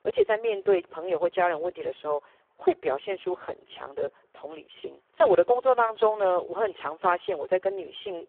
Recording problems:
phone-call audio; poor line

